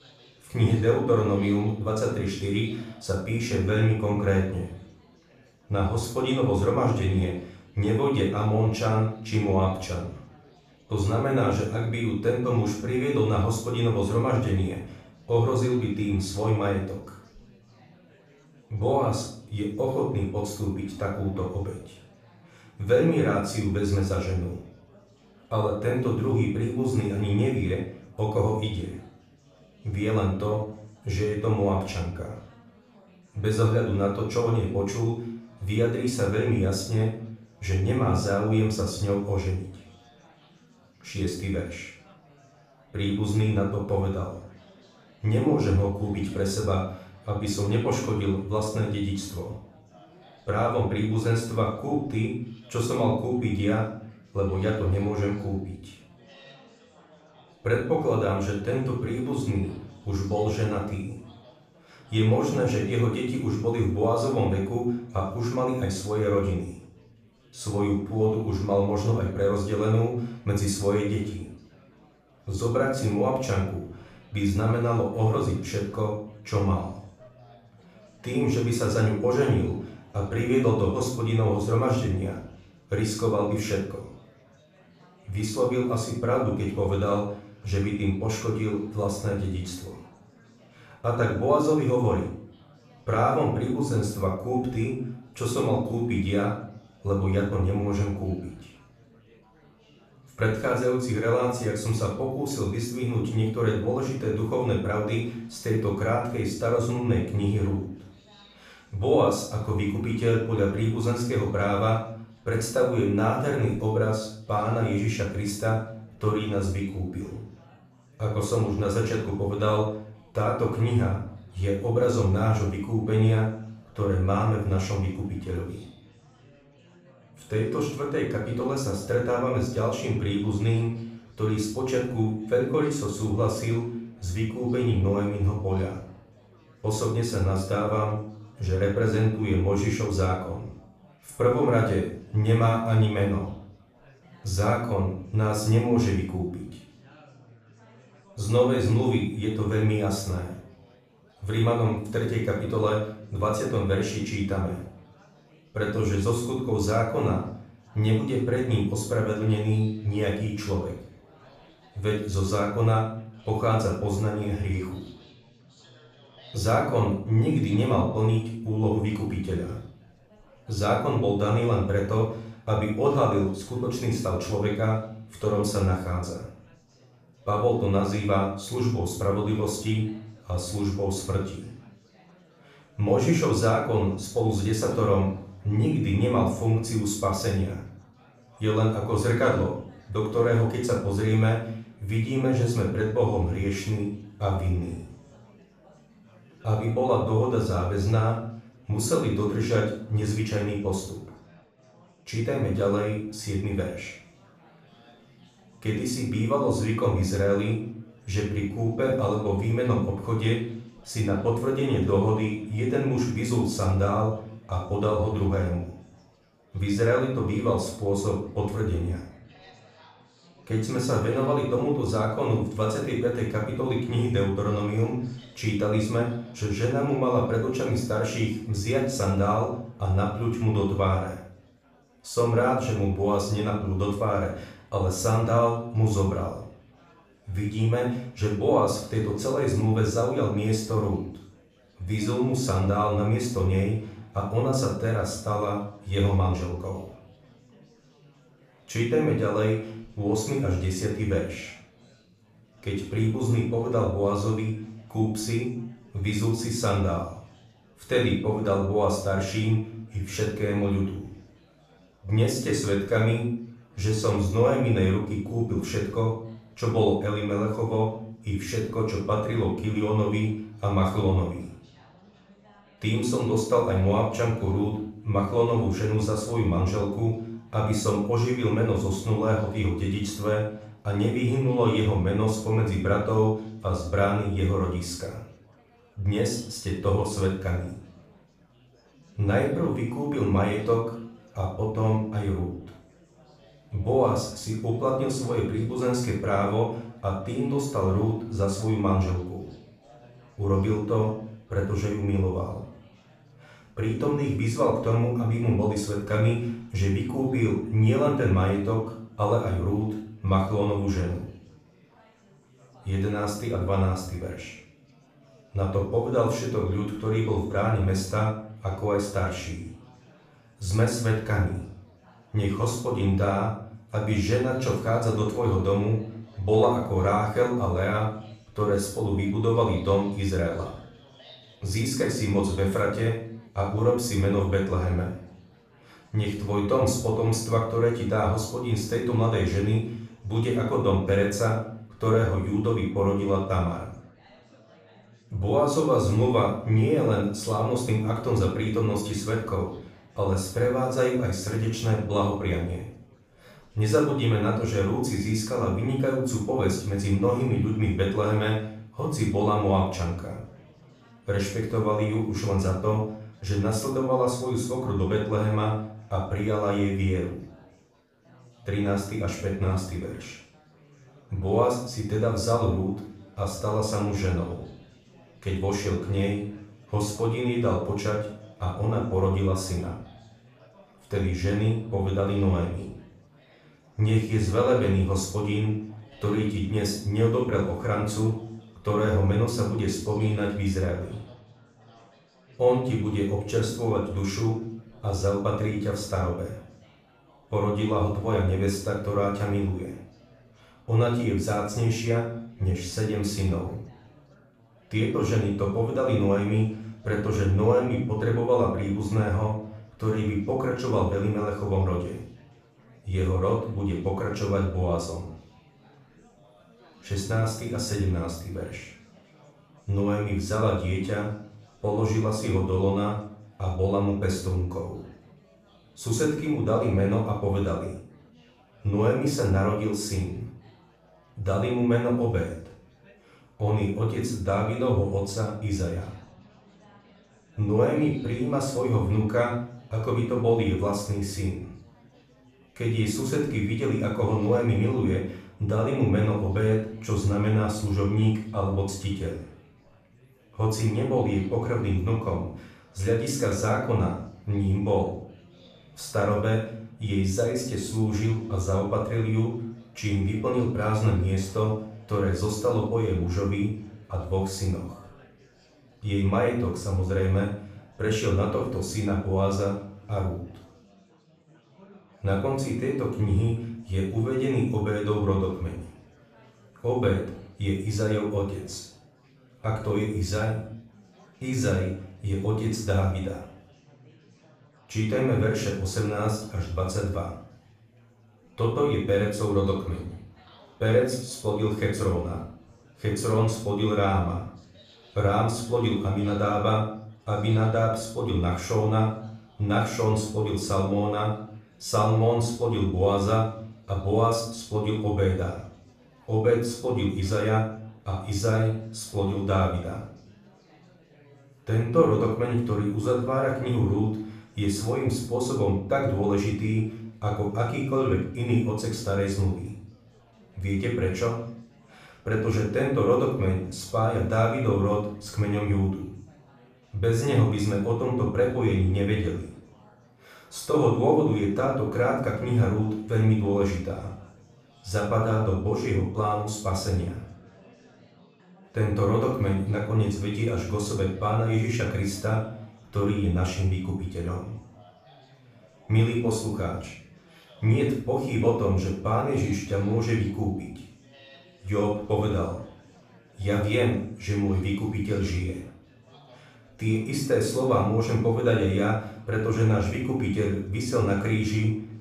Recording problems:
off-mic speech; far
room echo; noticeable; dies away in 0.5 s
chatter from many people; faint; throughout; 30 dB below the speech

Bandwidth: 14.5 kHz